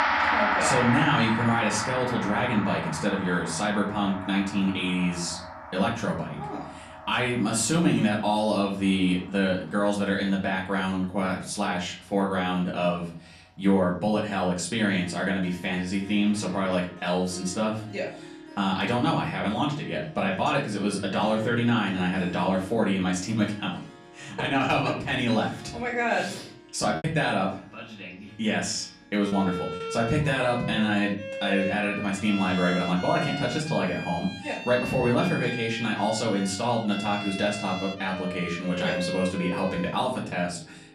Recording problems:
off-mic speech; far
room echo; slight; dies away in 0.4 s
background music; loud; throughout; 7 dB below the speech
choppy; occasionally; from 27 to 30 s; 4% of the speech affected

